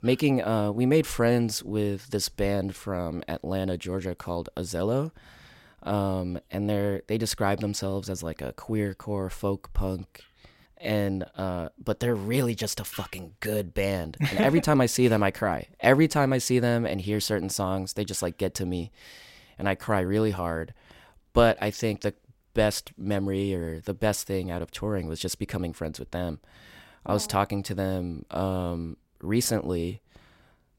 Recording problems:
none

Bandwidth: 16 kHz